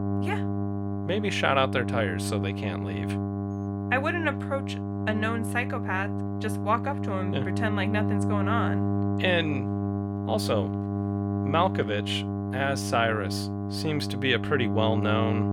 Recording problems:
electrical hum; loud; throughout; 50 Hz, 8 dB below the speech

